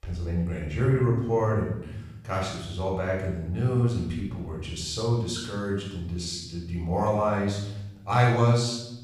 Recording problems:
off-mic speech; far
room echo; noticeable; dies away in 1 s

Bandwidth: 15.5 kHz